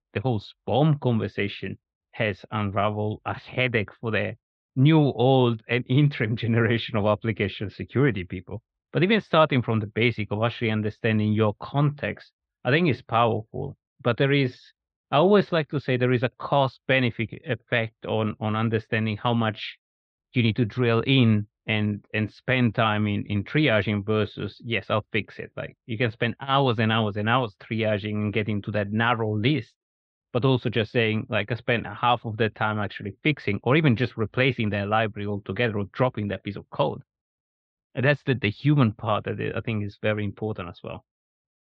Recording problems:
muffled; slightly; fading above 4 kHz

